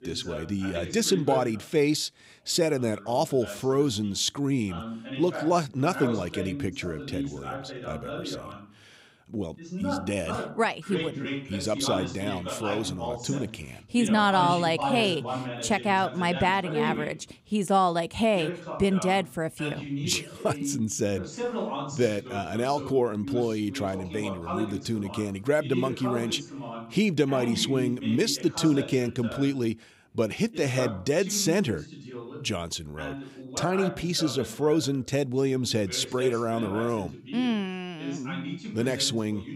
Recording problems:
voice in the background; loud; throughout; 9 dB below the speech

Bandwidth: 15.5 kHz